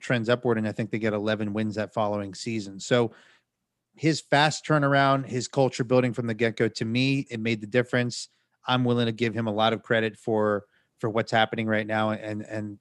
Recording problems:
none

